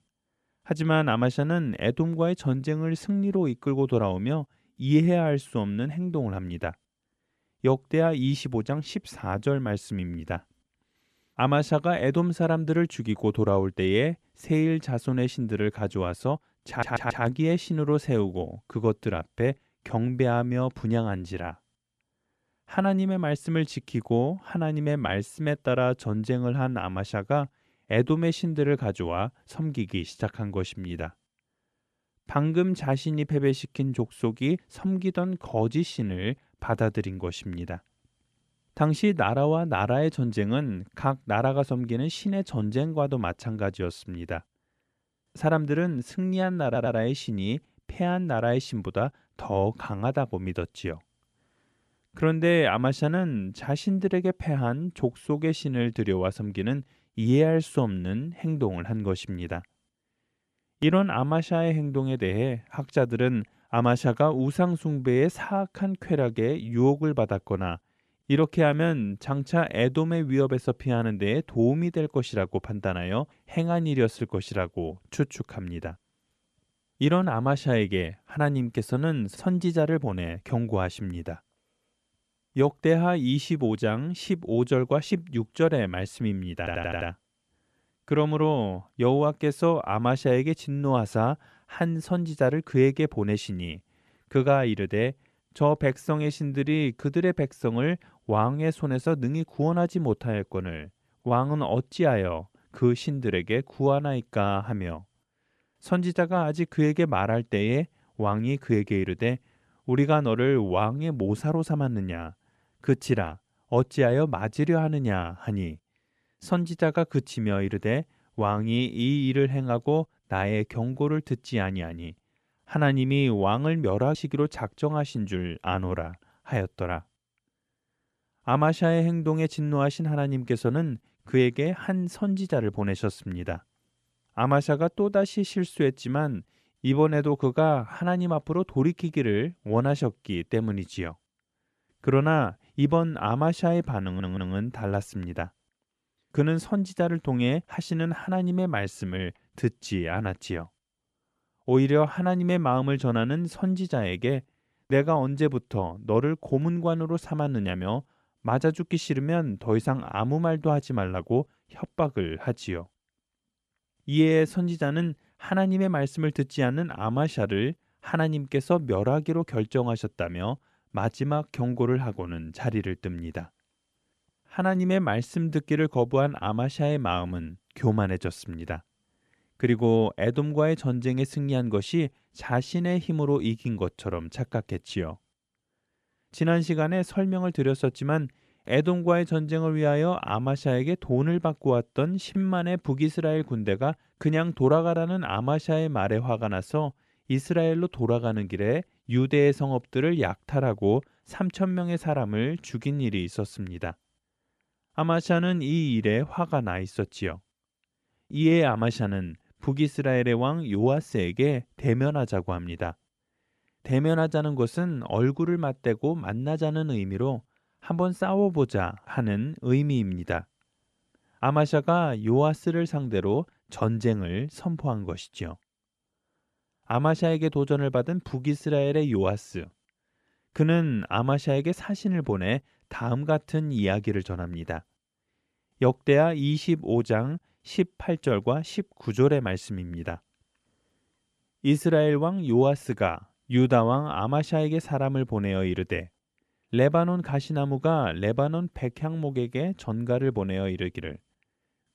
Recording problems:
audio stuttering; 4 times, first at 17 s

